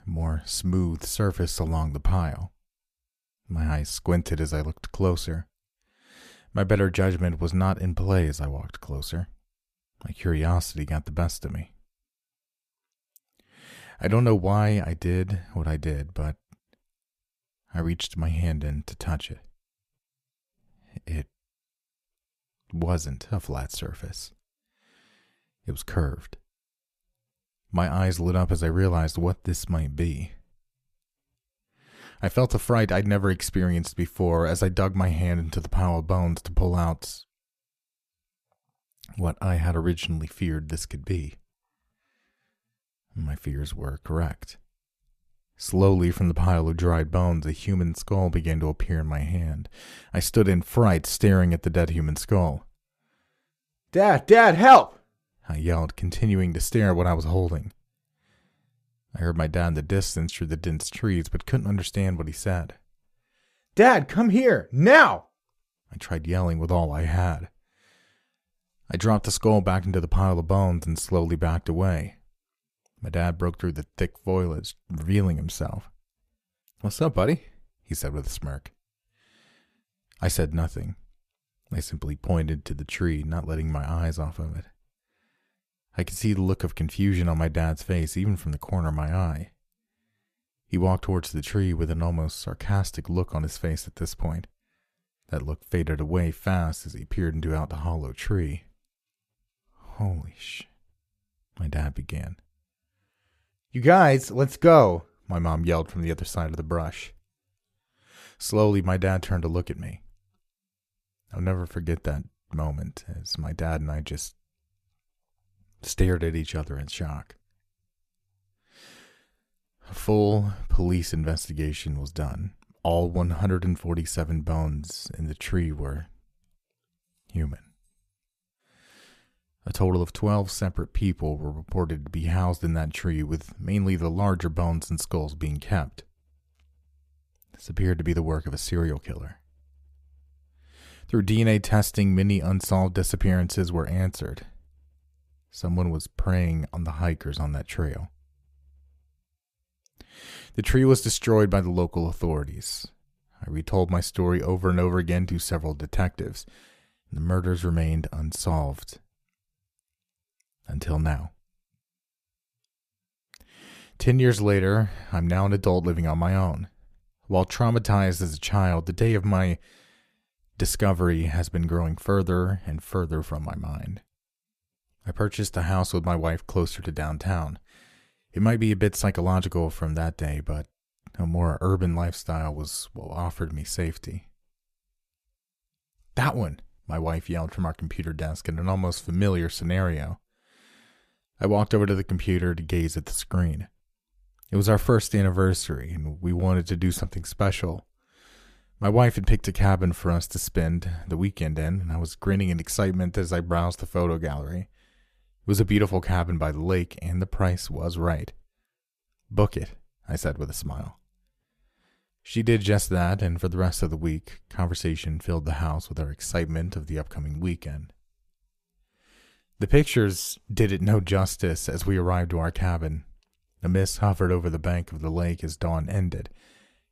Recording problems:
none

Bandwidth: 14.5 kHz